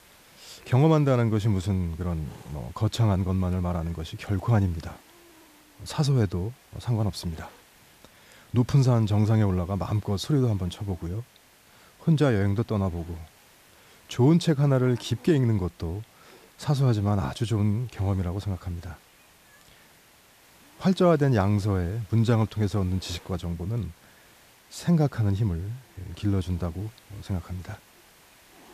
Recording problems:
hiss; faint; throughout; 25 dB below the speech

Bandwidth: 14.5 kHz